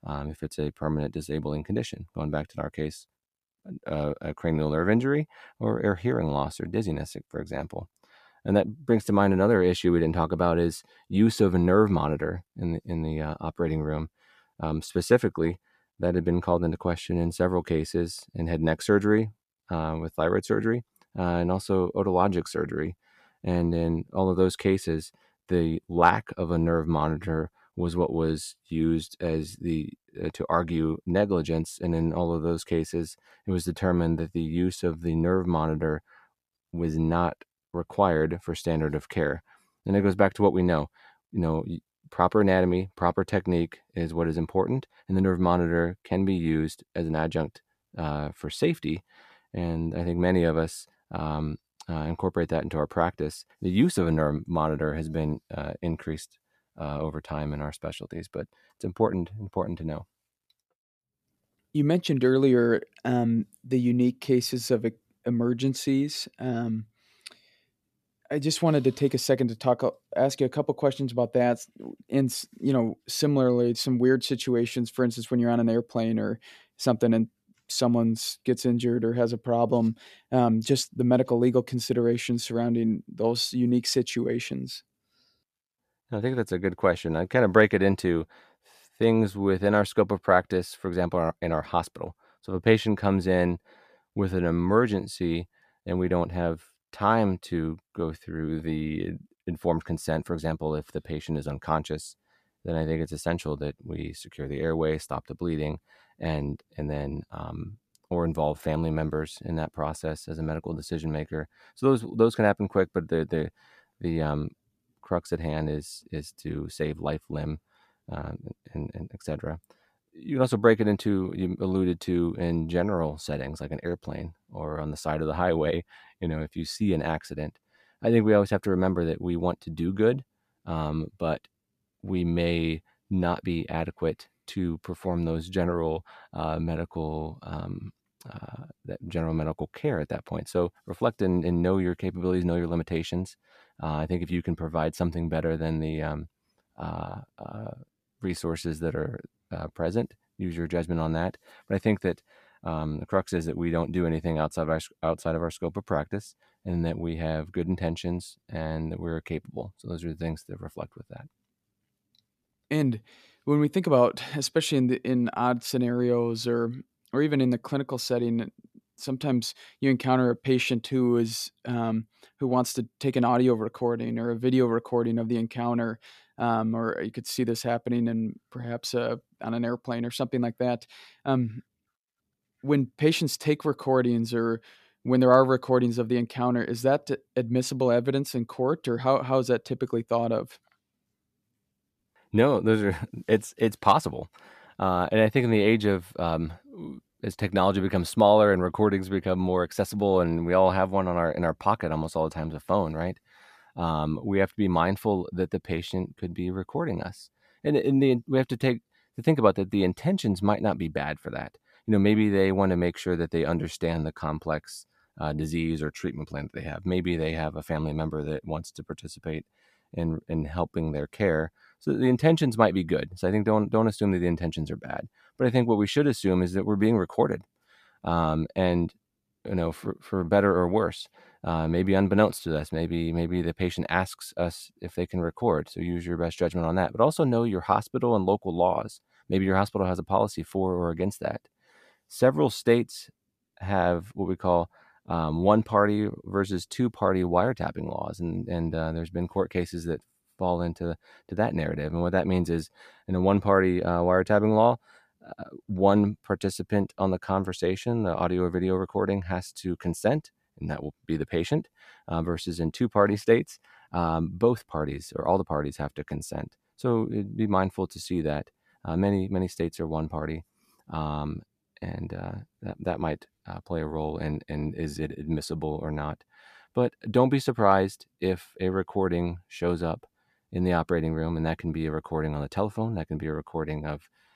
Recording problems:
none

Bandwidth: 14.5 kHz